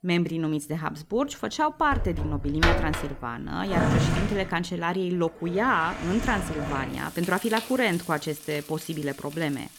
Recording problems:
household noises; loud; throughout; 3 dB below the speech

